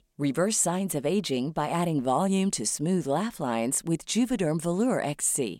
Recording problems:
none

